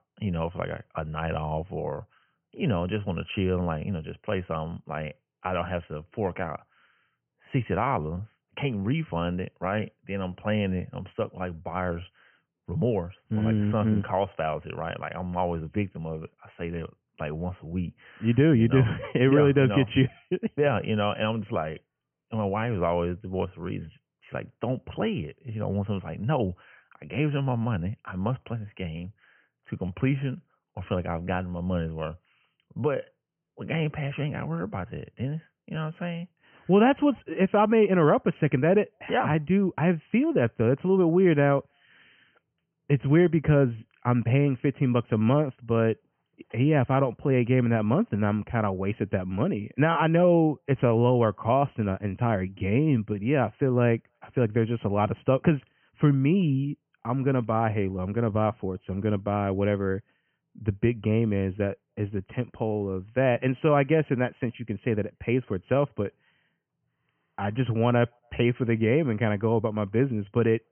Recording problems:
high frequencies cut off; severe; nothing above 3 kHz

